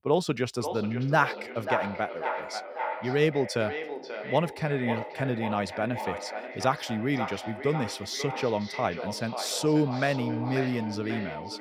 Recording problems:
echo of what is said; strong; throughout; 540 ms later, 7 dB below the speech

